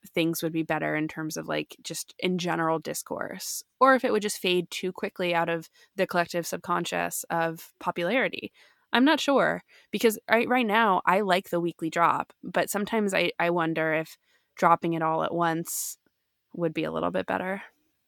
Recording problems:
none

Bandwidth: 18 kHz